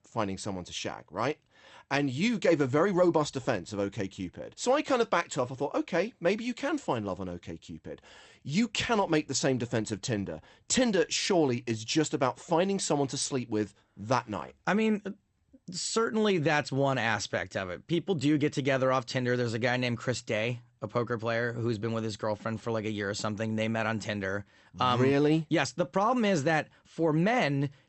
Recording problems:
garbled, watery; slightly; nothing above 8.5 kHz

